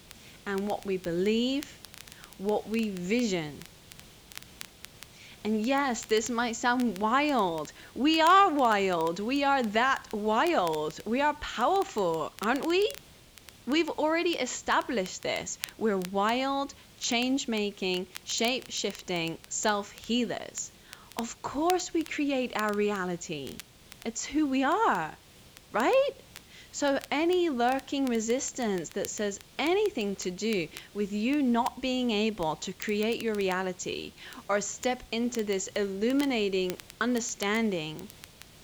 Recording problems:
high frequencies cut off; noticeable; nothing above 8 kHz
crackle, like an old record; noticeable; 20 dB below the speech
hiss; faint; throughout; 25 dB below the speech

